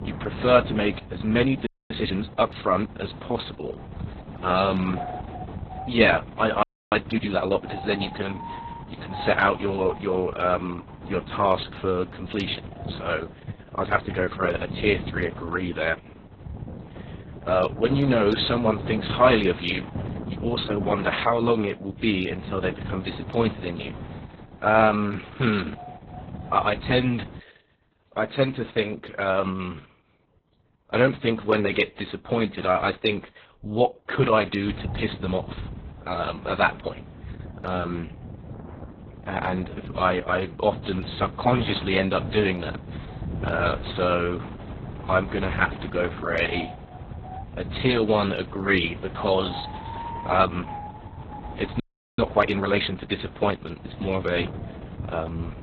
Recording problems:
garbled, watery; badly; nothing above 4 kHz
wind noise on the microphone; occasional gusts; until 27 s and from 35 s on; 15 dB below the speech
audio freezing; at 1.5 s, at 6.5 s and at 52 s

